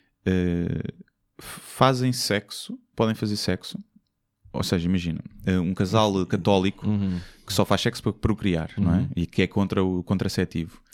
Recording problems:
none

